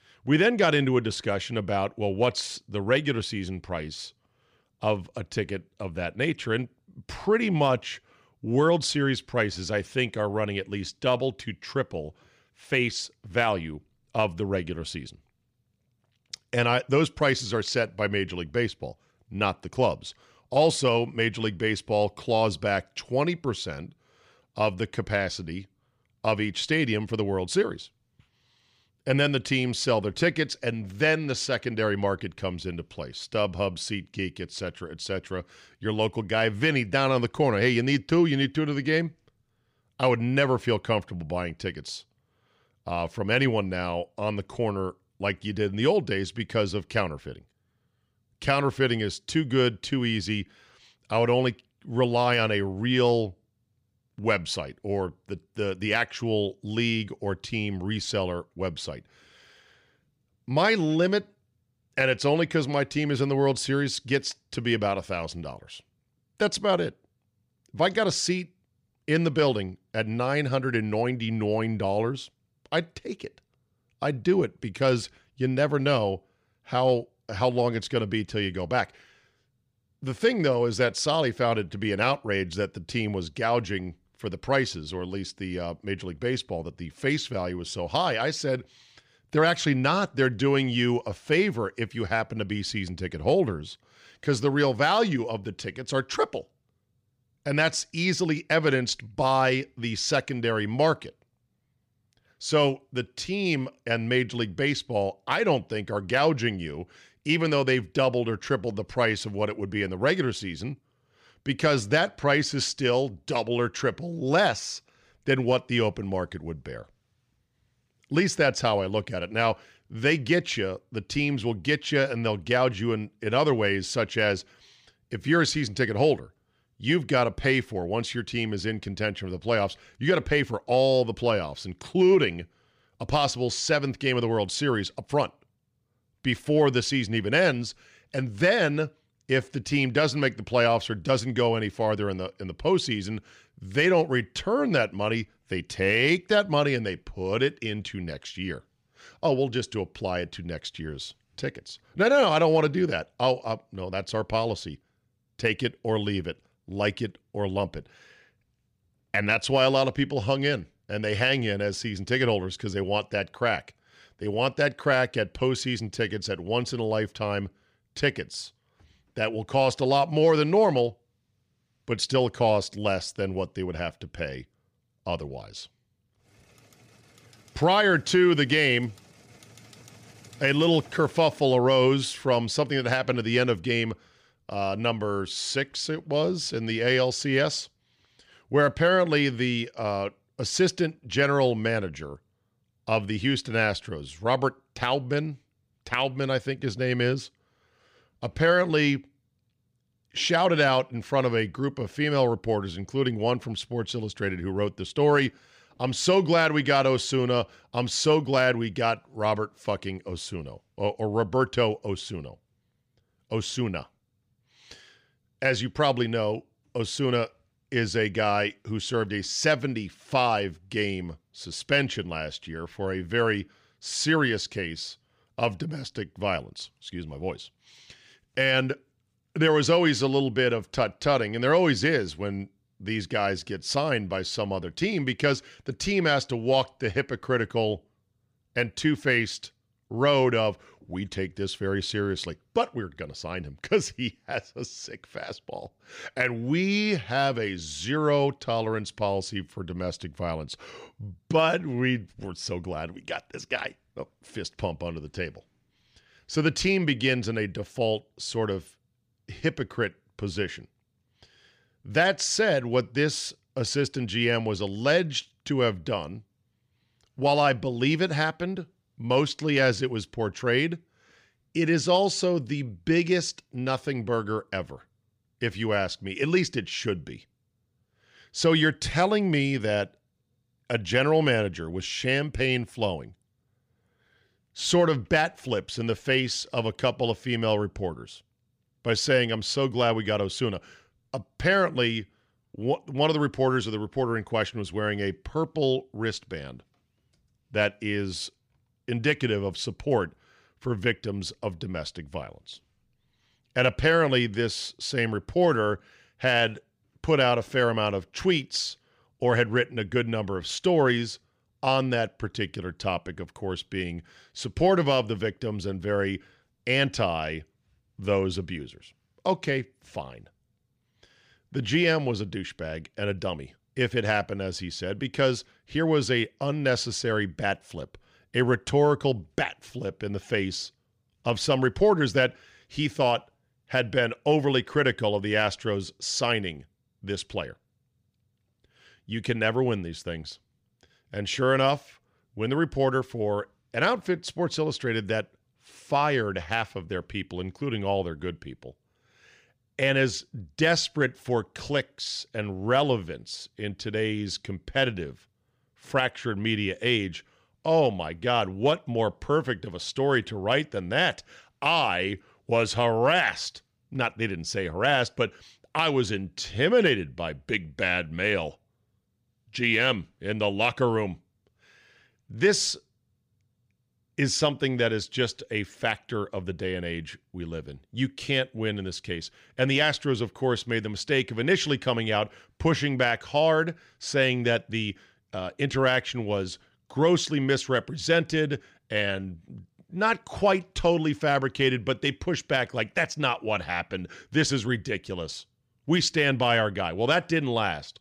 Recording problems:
none

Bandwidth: 15 kHz